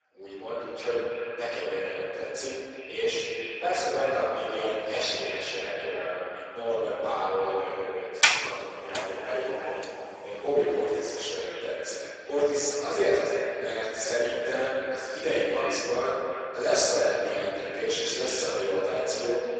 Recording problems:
echo of what is said; strong; throughout; 330 ms later, 8 dB below the speech
room echo; strong; dies away in 2 s
off-mic speech; far
garbled, watery; badly; nothing above 7.5 kHz
thin; very; fading below 400 Hz
door banging; loud; at 8 s; peak 9 dB above the speech

